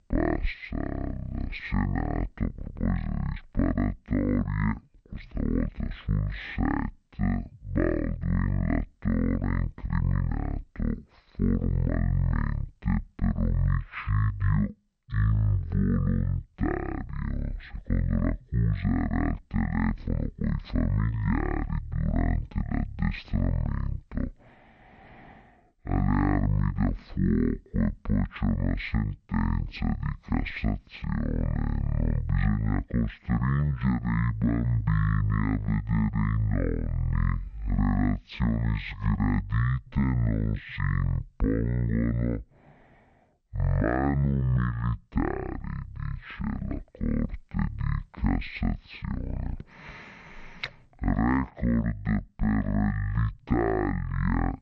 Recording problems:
wrong speed and pitch; too slow and too low; 0.5 times normal speed

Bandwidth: 8.5 kHz